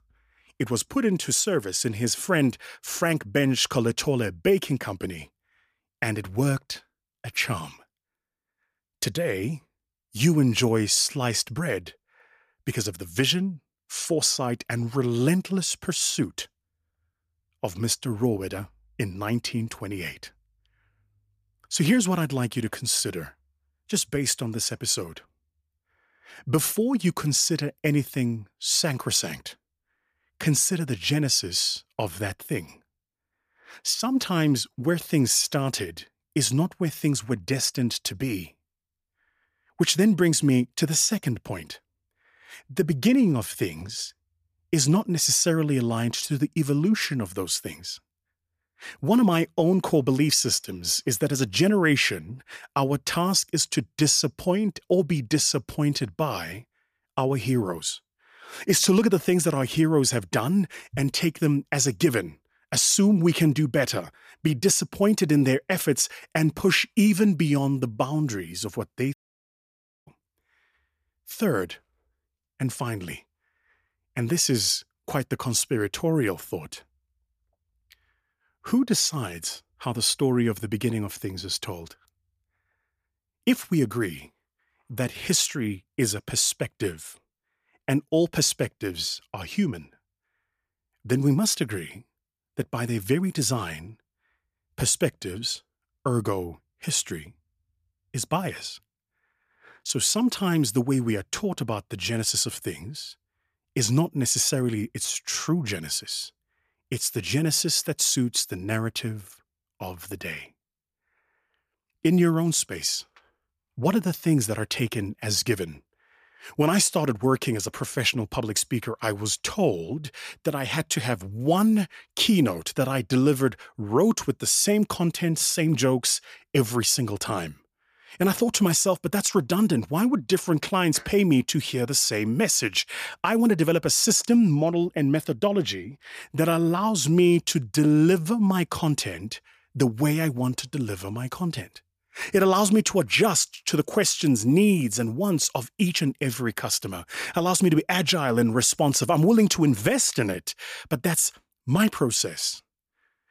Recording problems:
audio cutting out; at 1:09 for 1 s

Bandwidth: 14.5 kHz